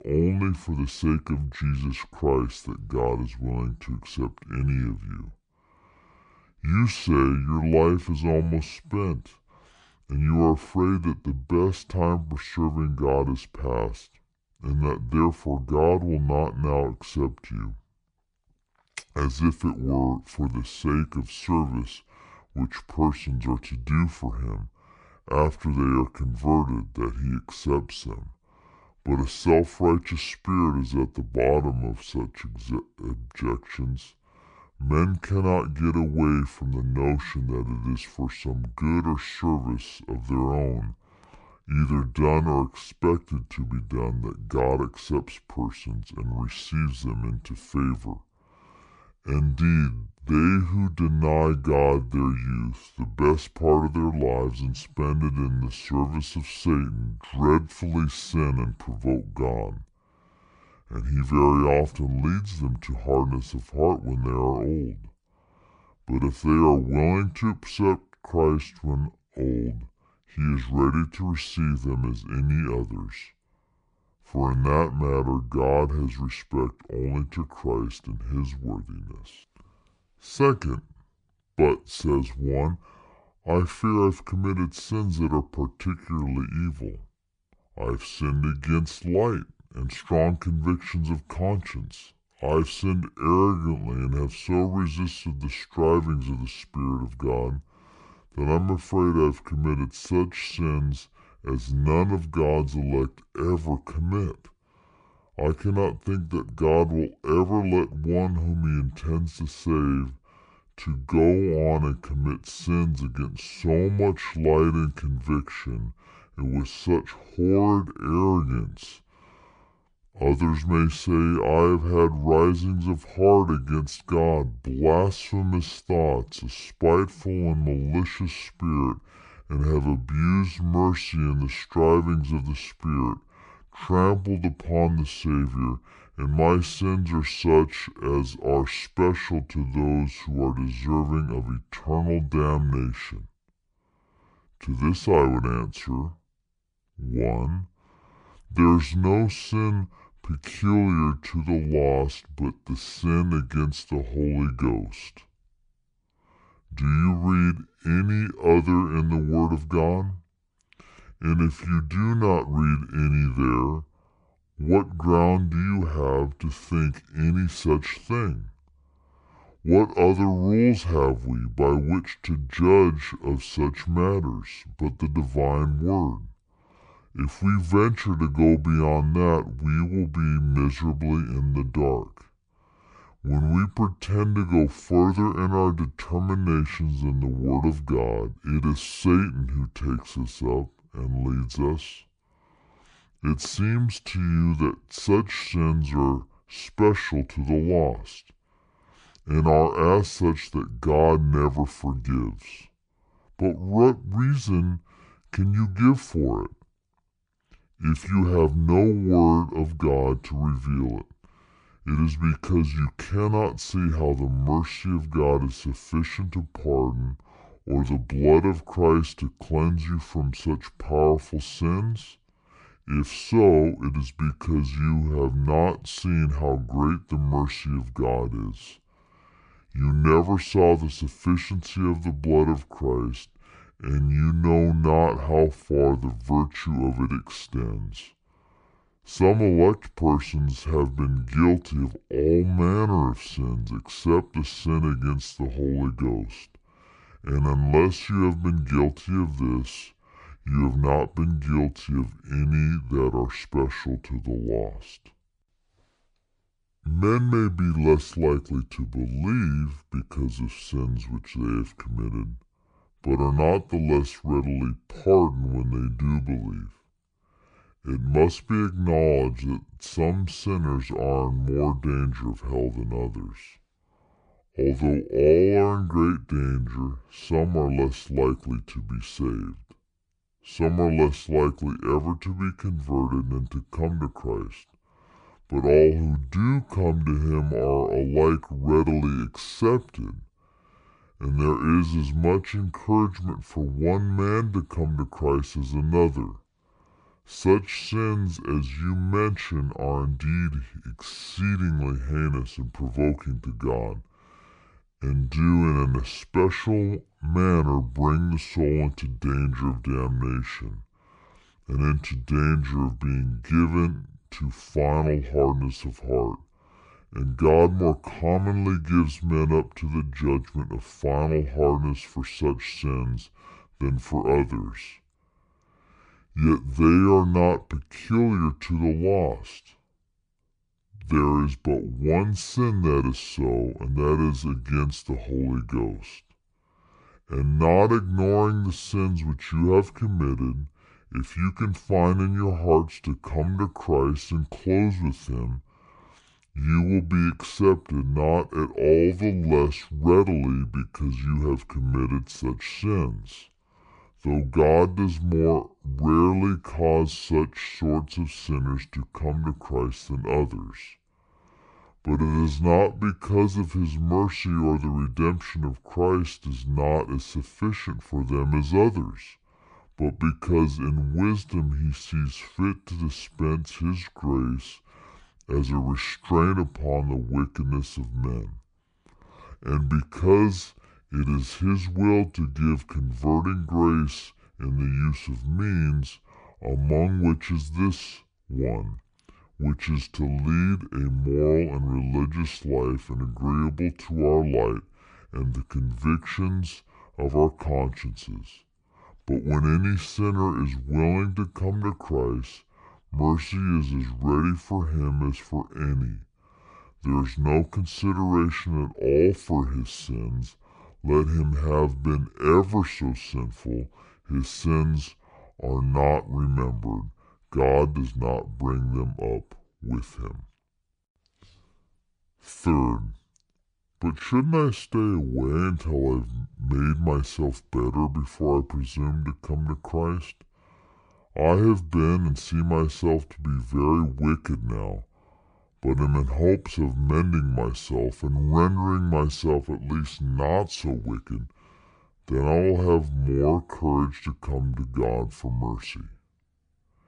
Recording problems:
wrong speed and pitch; too slow and too low; 0.6 times normal speed

